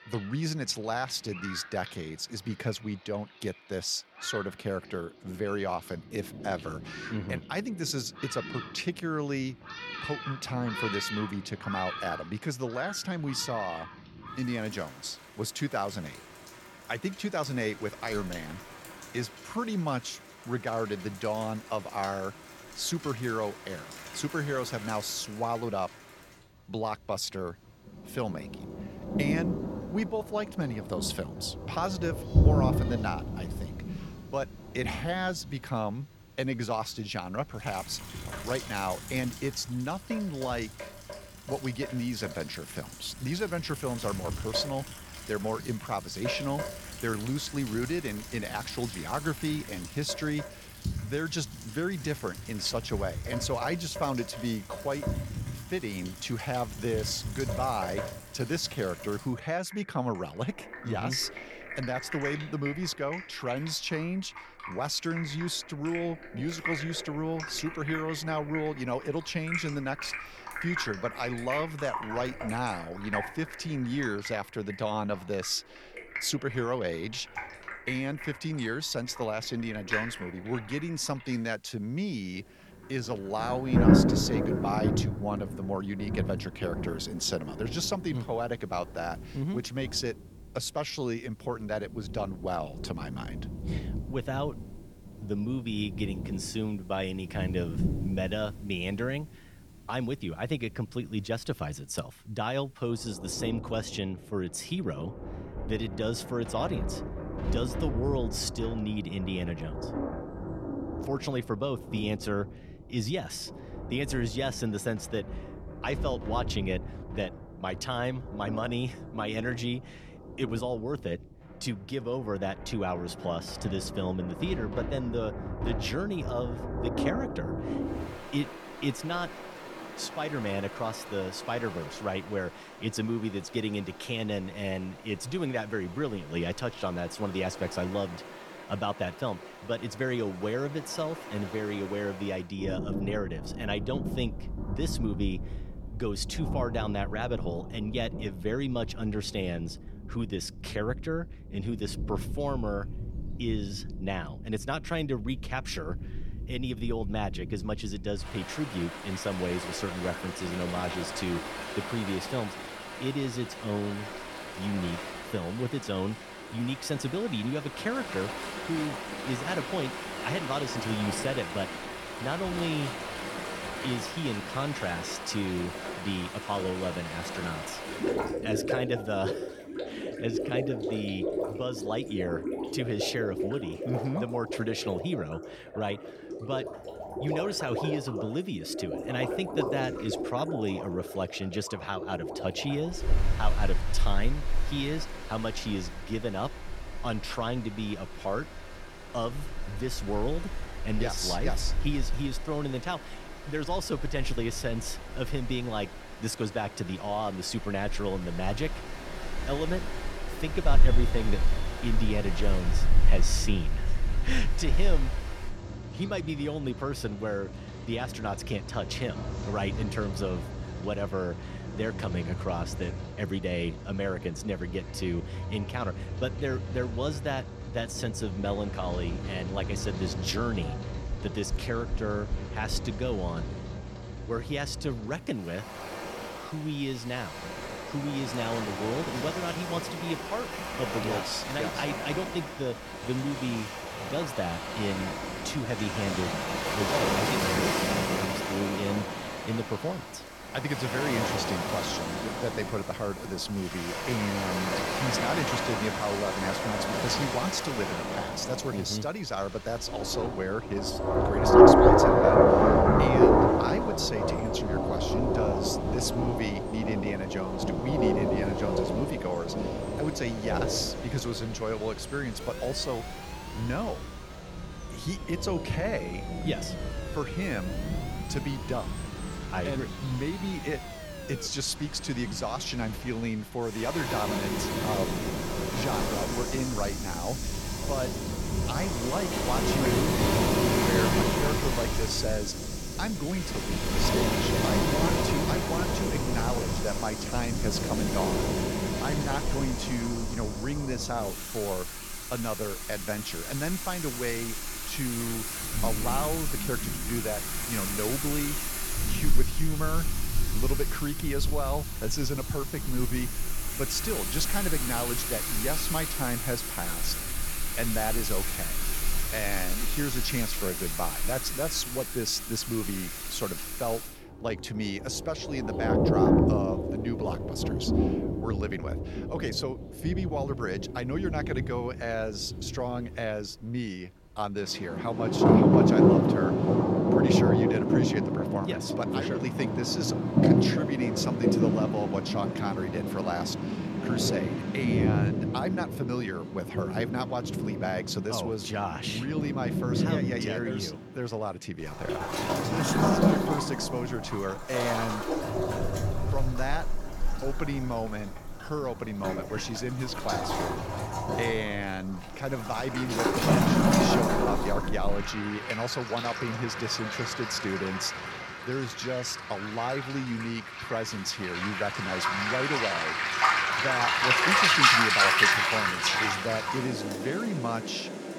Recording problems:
rain or running water; very loud; throughout; 3 dB above the speech
door banging; noticeable; from 3:51 to 3:53; peak 7 dB below the speech
siren; noticeable; from 4:32 to 4:41; peak 8 dB below the speech

